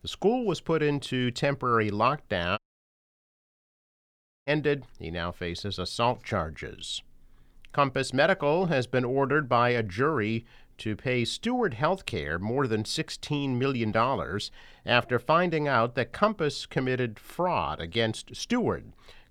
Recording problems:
audio cutting out; at 2.5 s for 2 s

